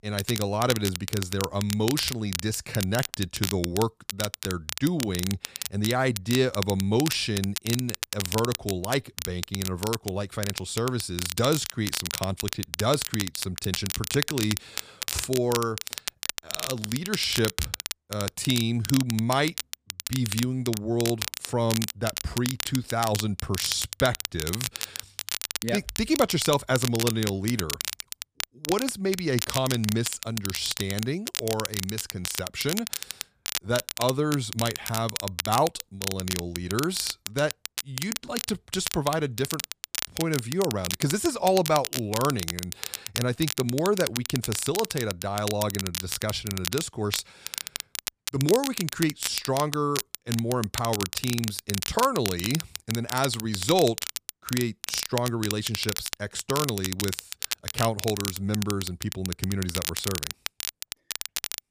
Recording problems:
crackle, like an old record; loud; 4 dB below the speech

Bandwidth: 15 kHz